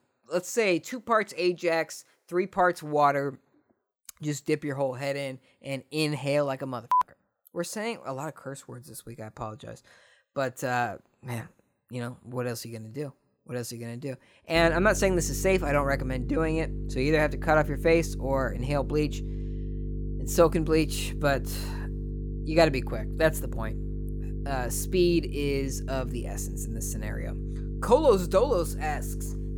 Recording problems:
electrical hum; noticeable; from 15 s on; 50 Hz, 20 dB below the speech

